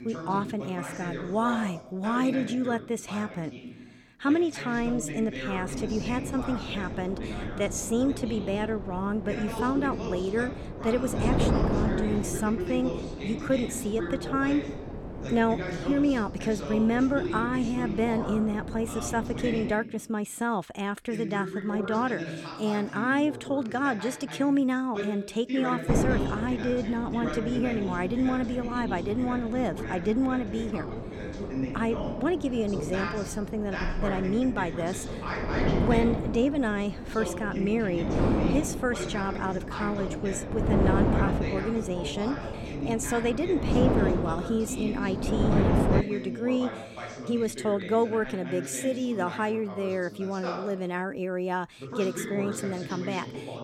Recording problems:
wind noise on the microphone; heavy; from 5.5 to 20 s and from 26 to 46 s; 6 dB below the speech
voice in the background; loud; throughout; 7 dB below the speech

